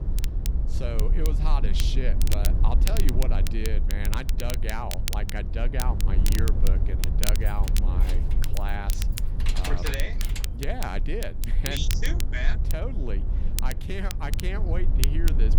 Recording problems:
low rumble; loud; throughout; 8 dB below the speech
crackle, like an old record; loud; 2 dB below the speech
jangling keys; loud; from 7.5 to 10 s; peak level with the speech

